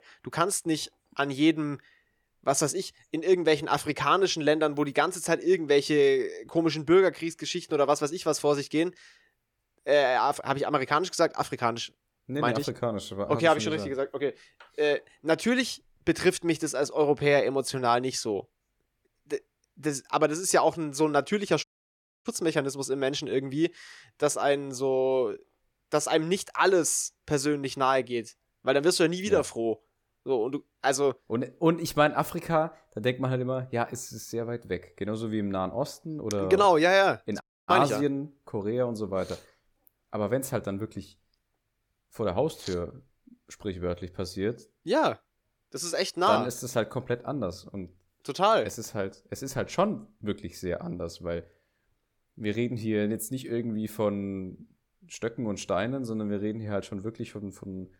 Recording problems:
audio cutting out; at 22 s for 0.5 s and at 37 s

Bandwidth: 18 kHz